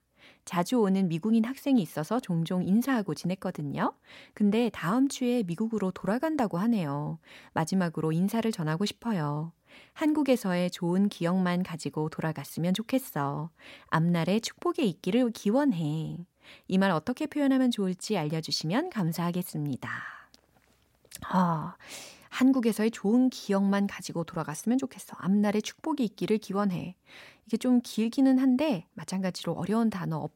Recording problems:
none

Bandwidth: 16 kHz